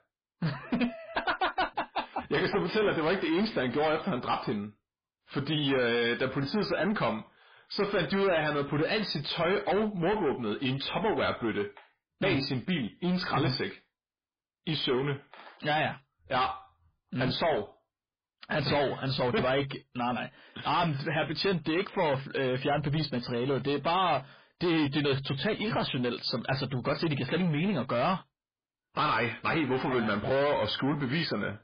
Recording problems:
distortion; heavy; 6 dB below the speech
garbled, watery; badly

